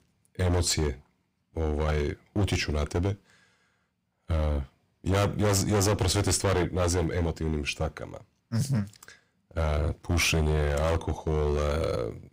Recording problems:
distortion; heavy; 12% of the sound clipped

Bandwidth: 15.5 kHz